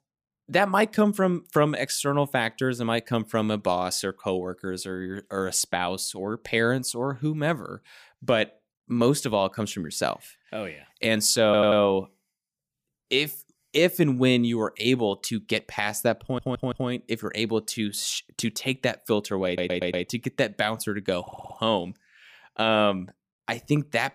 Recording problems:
audio stuttering; 4 times, first at 11 s

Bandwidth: 15 kHz